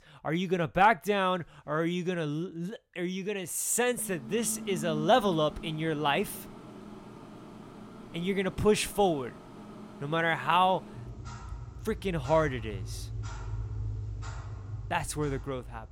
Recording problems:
household noises; noticeable; from 4 s on; 15 dB below the speech

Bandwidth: 16.5 kHz